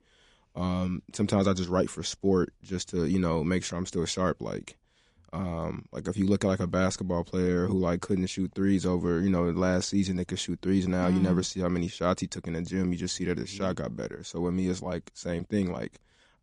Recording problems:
garbled, watery; slightly

